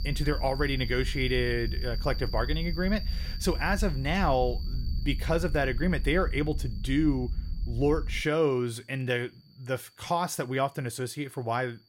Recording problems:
animal sounds; noticeable; throughout; 15 dB below the speech
low rumble; faint; until 8 s; 25 dB below the speech

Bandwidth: 16.5 kHz